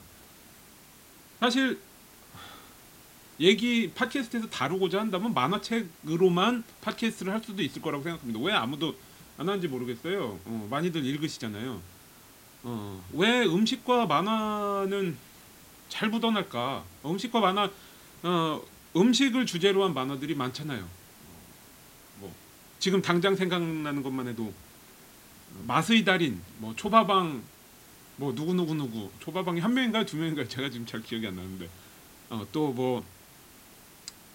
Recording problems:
hiss; faint; throughout; 25 dB below the speech

